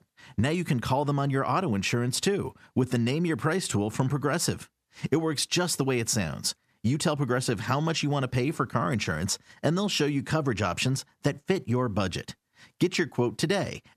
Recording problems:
squashed, flat; somewhat

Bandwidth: 14.5 kHz